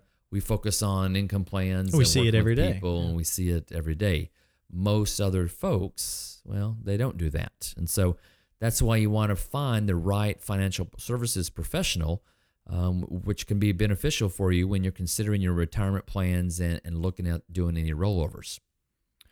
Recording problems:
none

